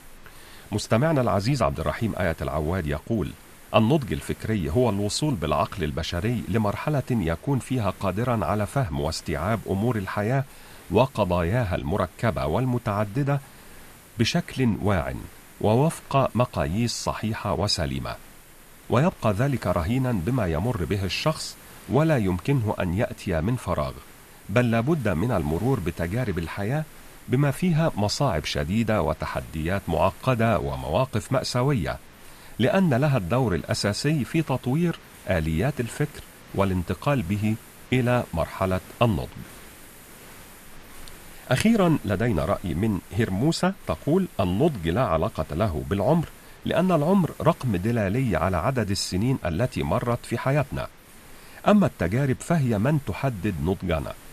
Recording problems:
hiss; faint; throughout; 20 dB below the speech

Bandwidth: 14.5 kHz